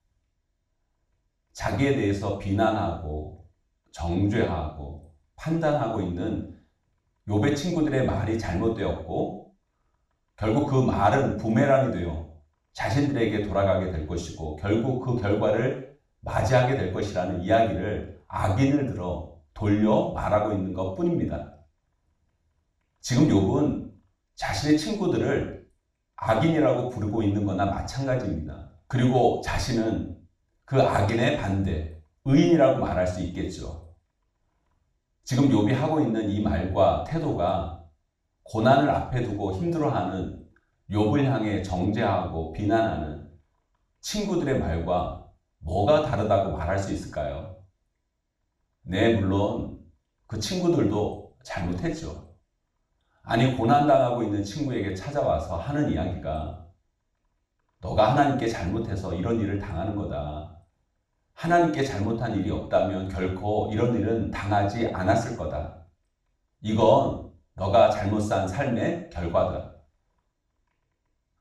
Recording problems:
off-mic speech; far
room echo; noticeable; dies away in 0.5 s

